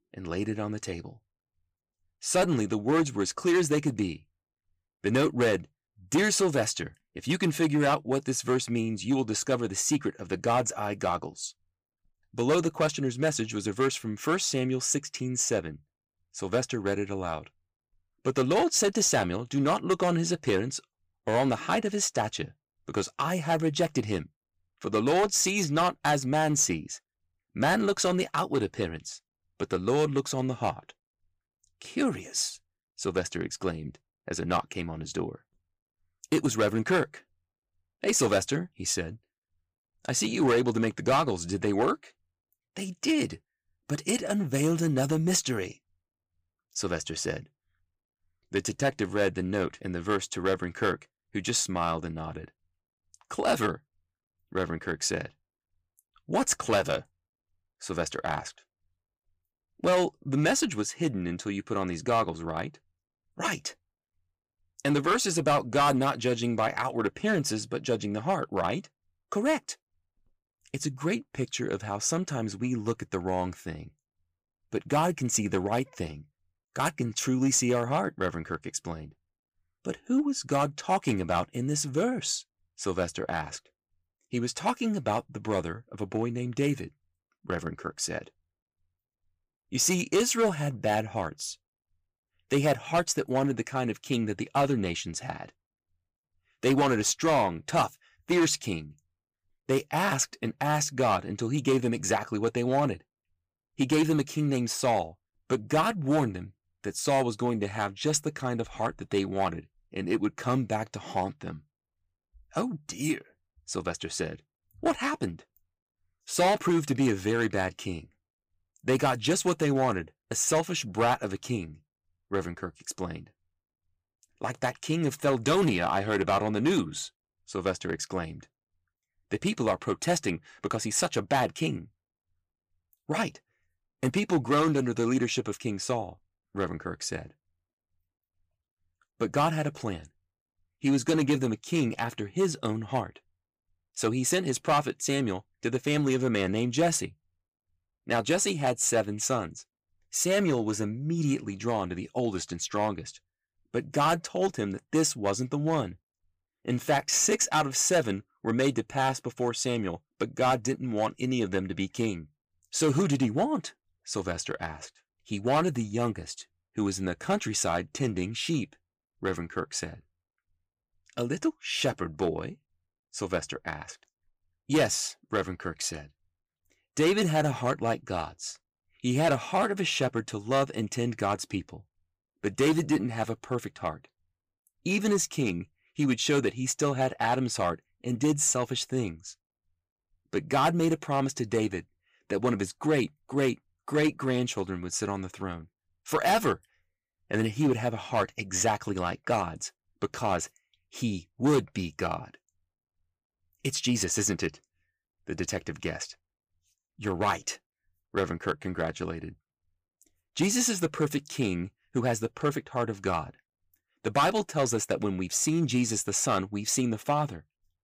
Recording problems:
distortion; slight; 3% of the sound clipped

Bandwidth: 15 kHz